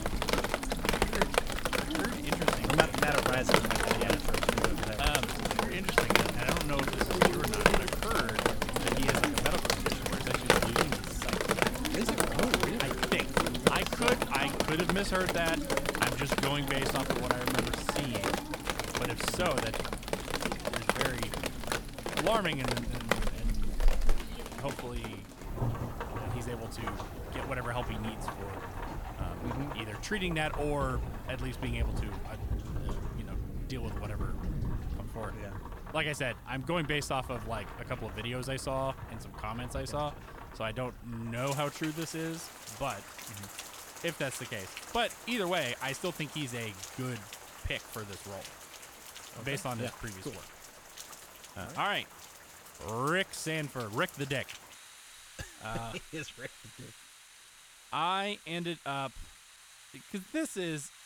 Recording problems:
rain or running water; very loud; throughout; 3 dB above the speech

